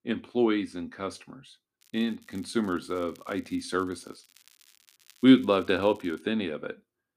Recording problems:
crackling; faint; from 2 to 6 s; 30 dB below the speech

